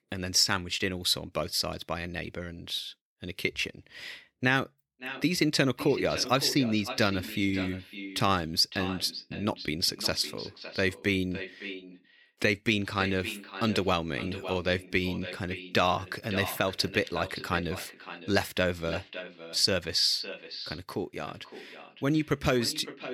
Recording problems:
echo of what is said; strong; from 5 s on; 560 ms later, 10 dB below the speech

